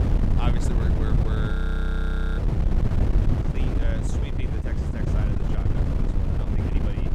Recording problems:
wind noise on the microphone; heavy; 3 dB above the speech
voice in the background; faint; throughout; 20 dB below the speech
audio freezing; at 1.5 s for 1 s

